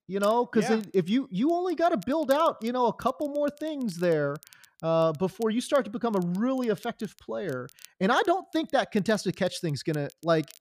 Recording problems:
crackle, like an old record; faint; 25 dB below the speech

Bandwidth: 15 kHz